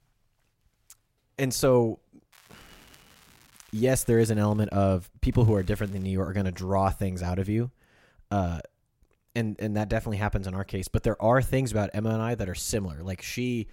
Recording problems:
crackling; faint; from 2.5 to 4.5 s and at 5.5 s; 30 dB below the speech

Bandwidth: 16 kHz